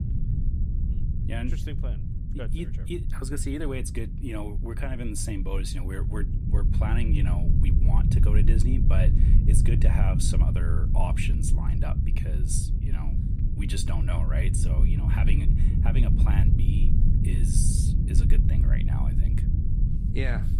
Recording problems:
low rumble; loud; throughout; 2 dB below the speech

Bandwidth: 15.5 kHz